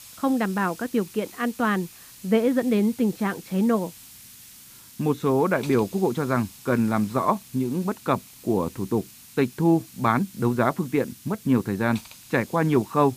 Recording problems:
muffled; very; fading above 2 kHz
hiss; noticeable; throughout; 20 dB below the speech

